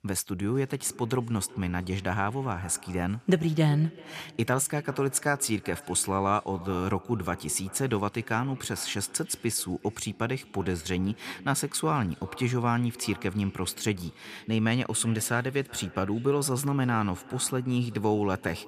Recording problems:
echo of what is said; faint; throughout; 380 ms later, 20 dB below the speech

